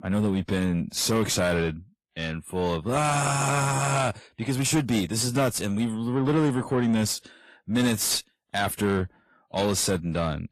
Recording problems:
distortion; slight; 10 dB below the speech
garbled, watery; slightly; nothing above 13.5 kHz

